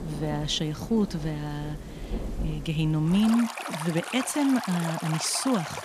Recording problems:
rain or running water; loud; throughout; 9 dB below the speech

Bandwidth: 15 kHz